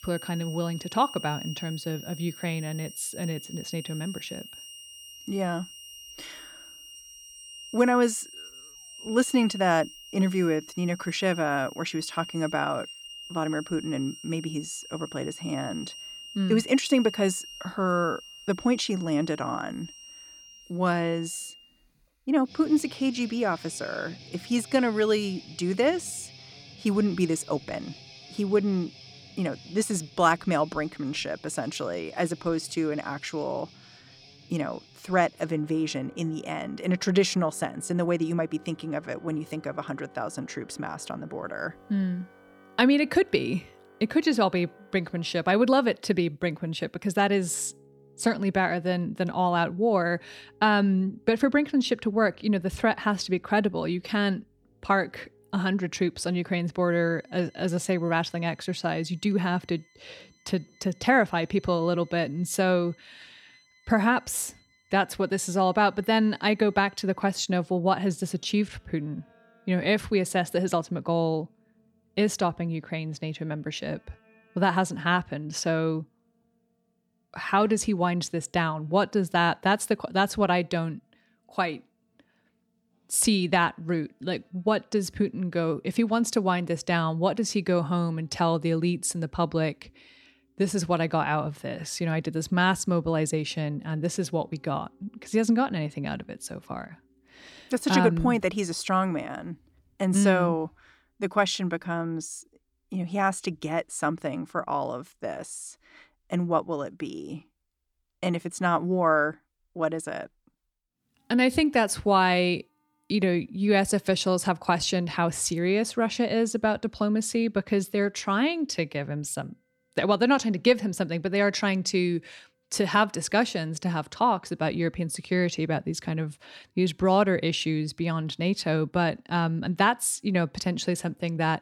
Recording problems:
background music; noticeable; throughout; 20 dB below the speech

